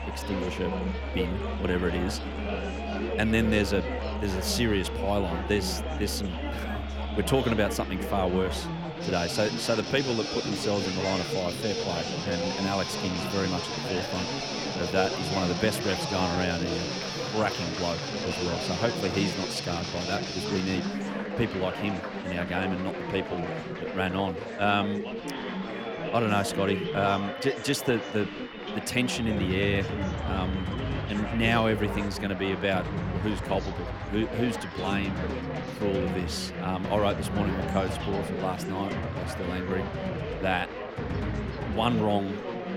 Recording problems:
background music; loud; throughout; 6 dB below the speech
chatter from many people; loud; throughout; 5 dB below the speech

